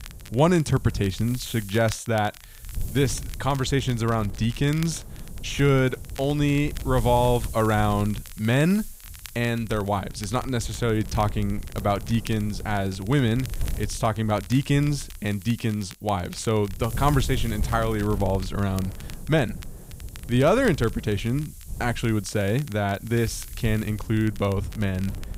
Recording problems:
wind noise on the microphone; occasional gusts; 20 dB below the speech
crackle, like an old record; faint; 20 dB below the speech

